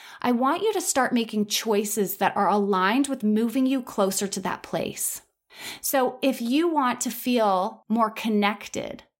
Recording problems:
none

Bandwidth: 16 kHz